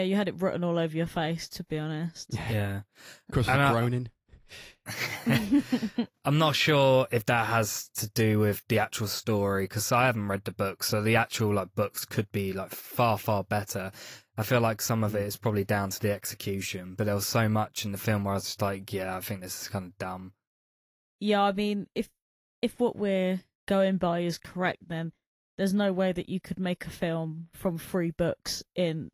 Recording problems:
garbled, watery; slightly; nothing above 15 kHz
abrupt cut into speech; at the start

